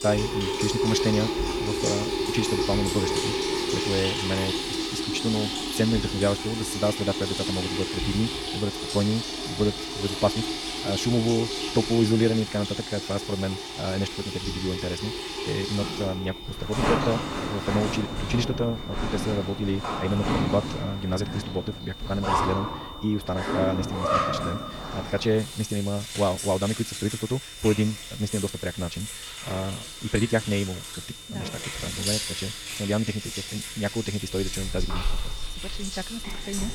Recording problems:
wrong speed, natural pitch; too fast; 1.5 times normal speed
household noises; loud; throughout; 2 dB below the speech
high-pitched whine; noticeable; throughout; 3.5 kHz, 15 dB below the speech
hiss; faint; throughout; 30 dB below the speech

